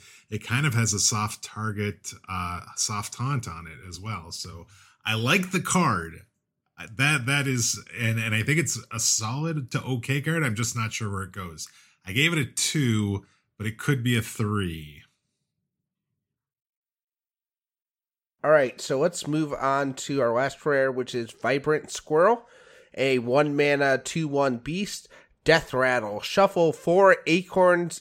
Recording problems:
none

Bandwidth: 16 kHz